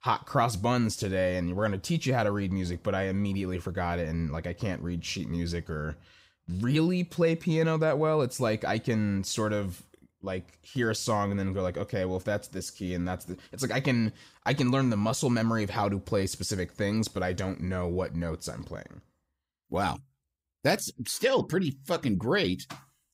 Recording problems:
none

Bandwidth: 15.5 kHz